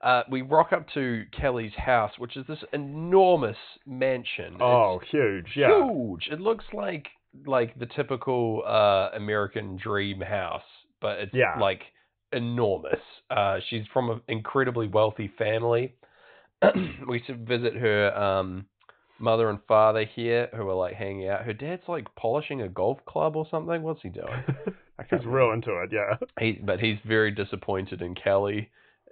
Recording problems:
high frequencies cut off; severe; nothing above 4 kHz

